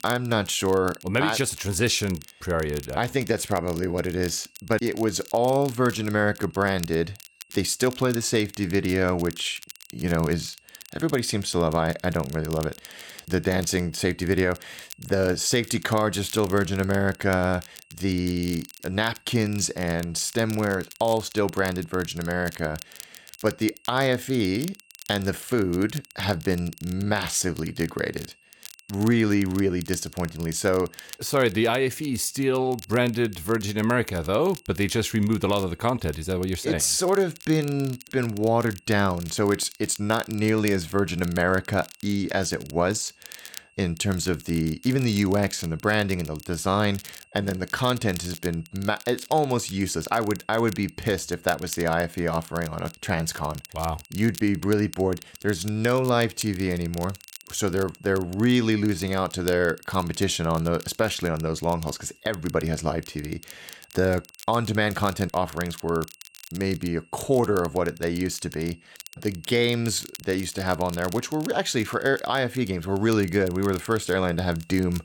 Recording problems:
crackle, like an old record; noticeable; 20 dB below the speech
high-pitched whine; faint; throughout; 2.5 kHz, 30 dB below the speech

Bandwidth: 17.5 kHz